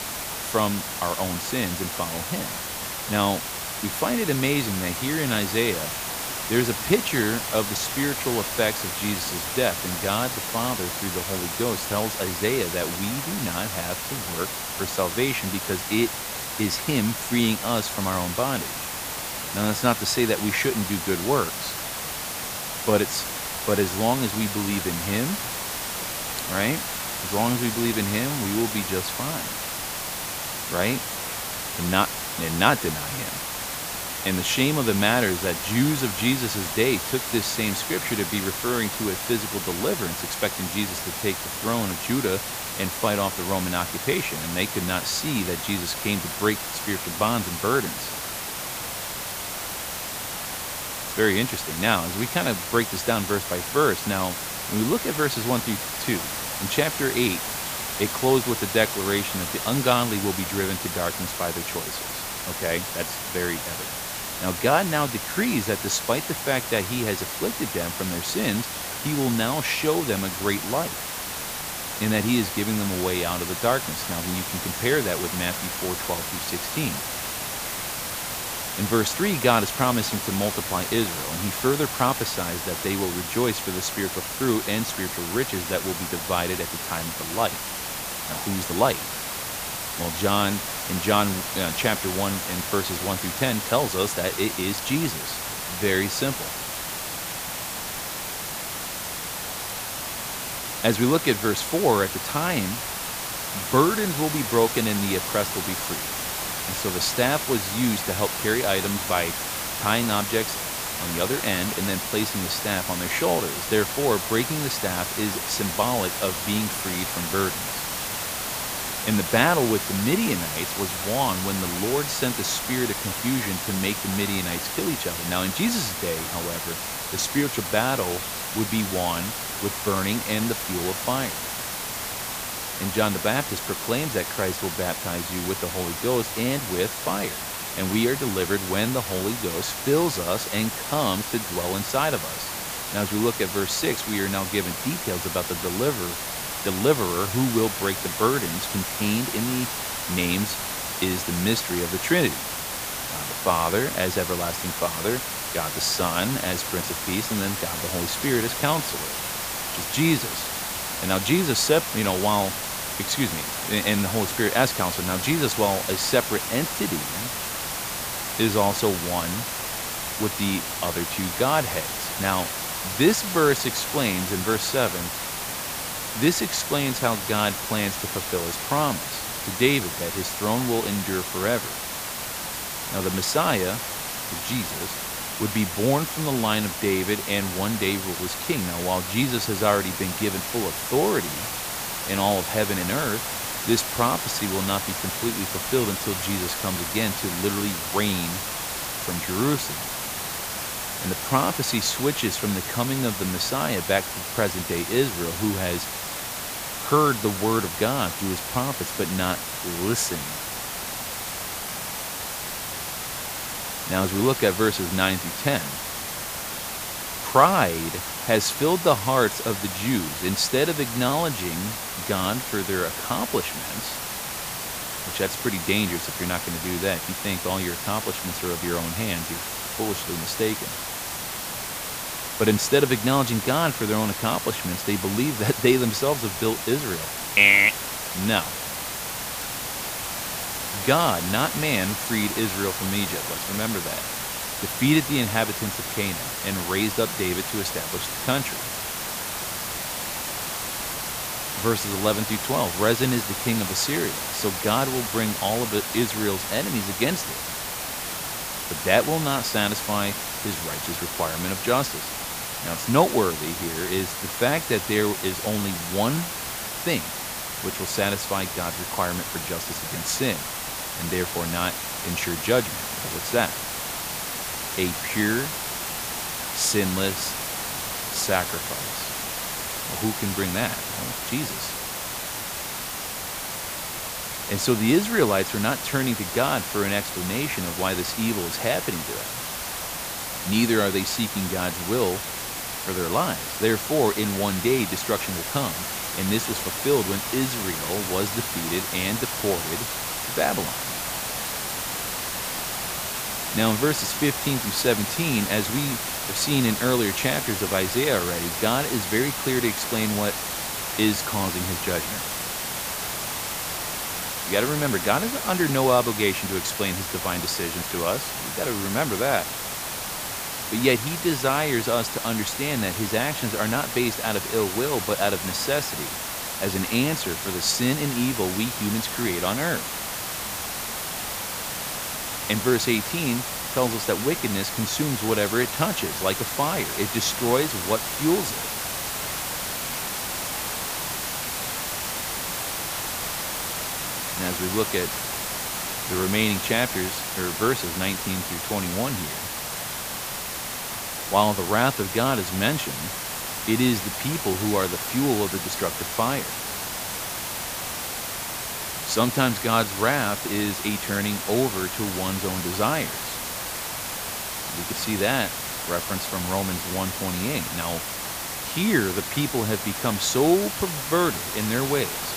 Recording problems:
hiss; loud; throughout; 3 dB below the speech

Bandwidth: 15 kHz